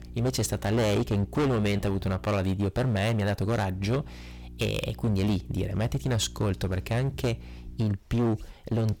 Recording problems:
distortion; heavy; 15% of the sound clipped
electrical hum; faint; until 2.5 s and from 3.5 to 8 s; 60 Hz, 25 dB below the speech

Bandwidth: 17 kHz